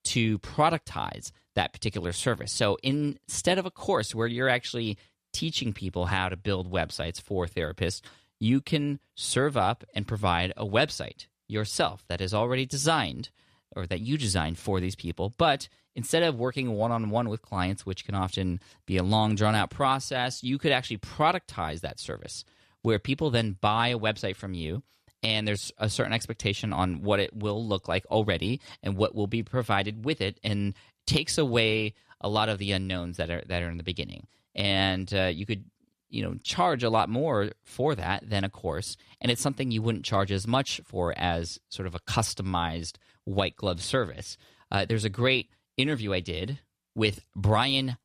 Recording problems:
none

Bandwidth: 14 kHz